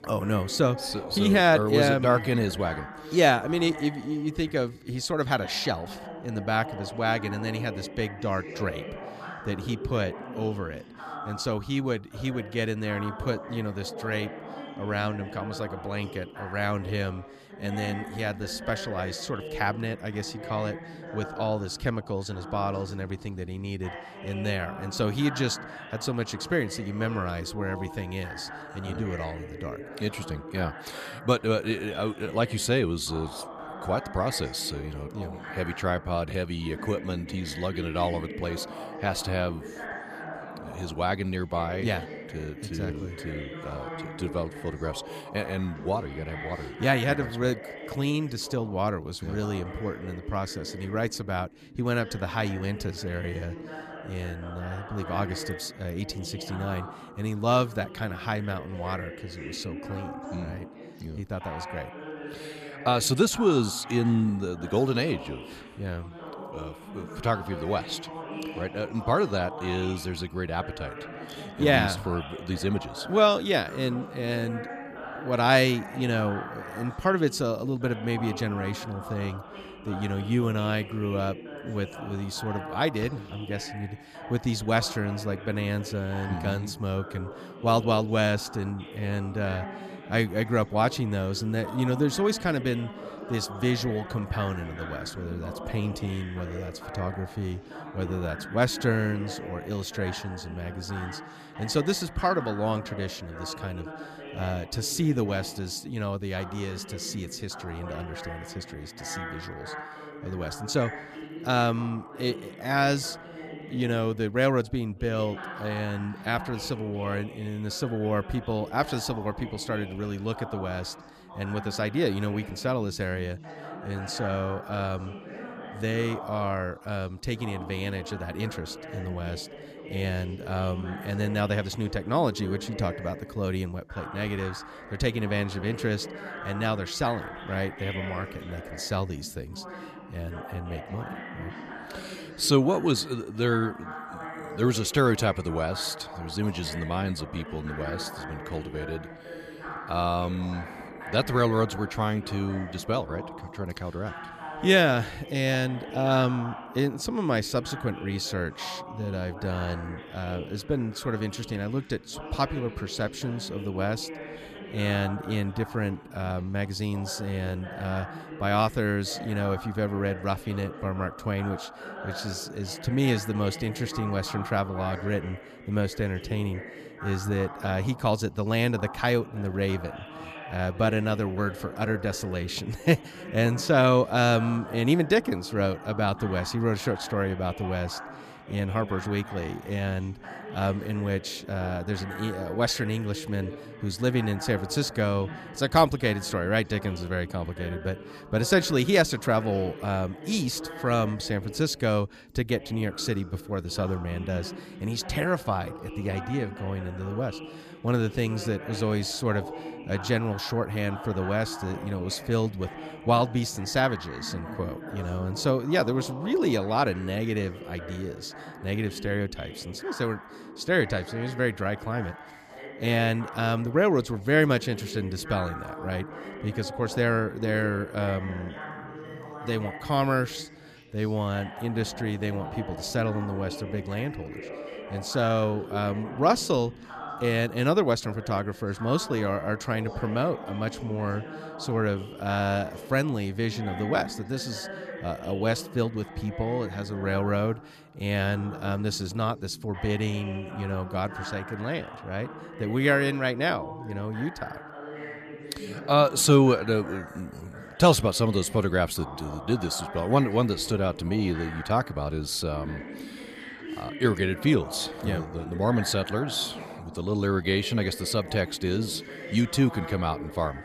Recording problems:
background chatter; noticeable; throughout; 2 voices, 10 dB below the speech

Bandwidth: 14.5 kHz